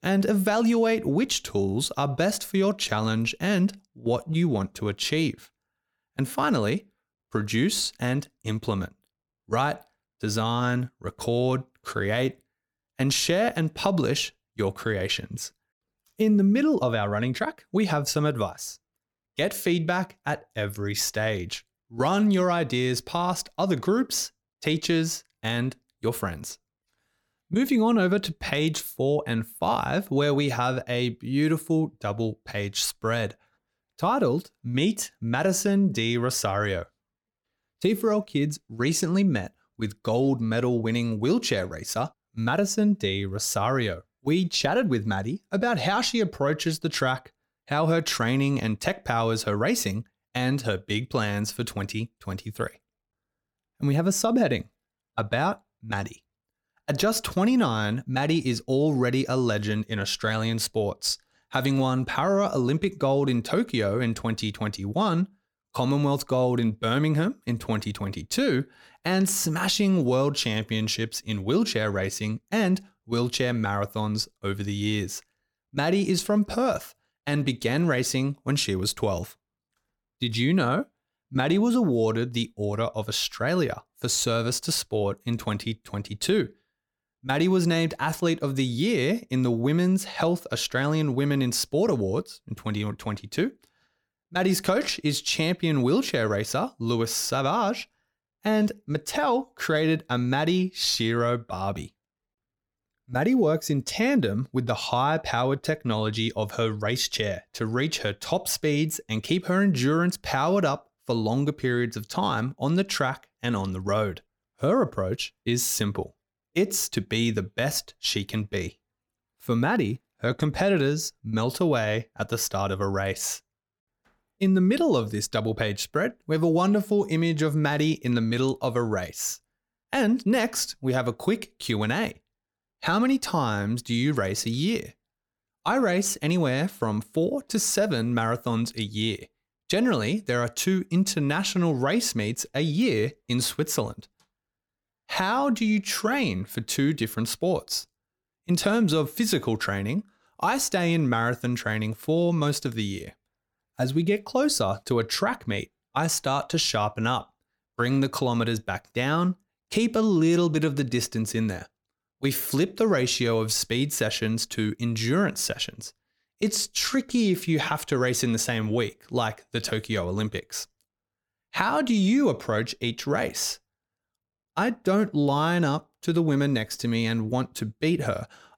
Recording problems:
none

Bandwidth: 18 kHz